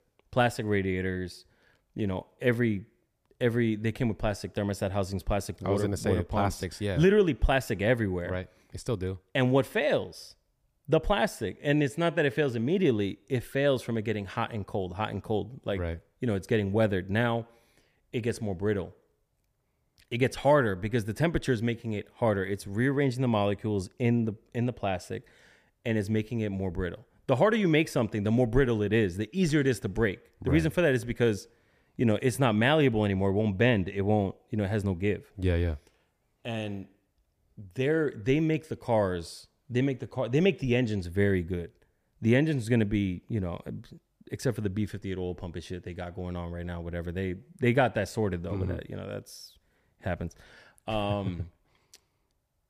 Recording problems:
none

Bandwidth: 15 kHz